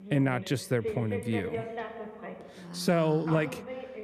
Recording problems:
voice in the background; loud; throughout; 9 dB below the speech

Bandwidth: 14 kHz